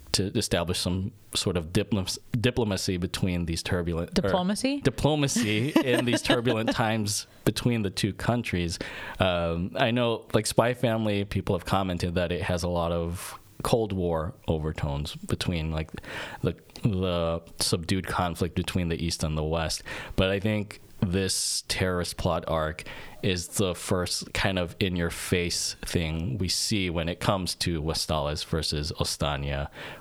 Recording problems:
squashed, flat; heavily

